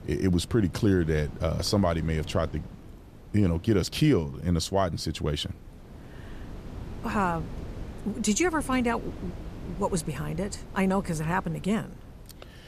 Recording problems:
wind noise on the microphone; occasional gusts; 20 dB below the speech

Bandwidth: 14.5 kHz